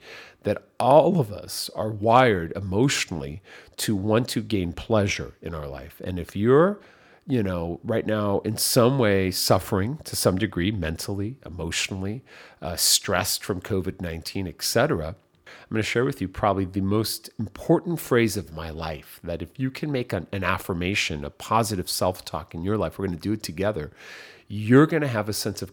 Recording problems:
none

